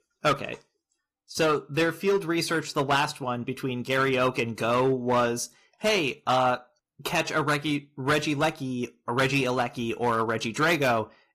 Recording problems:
distortion; slight; 5% of the sound clipped
garbled, watery; slightly; nothing above 14.5 kHz

